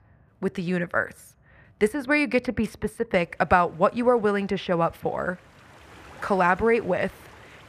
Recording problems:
muffled; slightly; fading above 3 kHz
rain or running water; faint; throughout; 25 dB below the speech

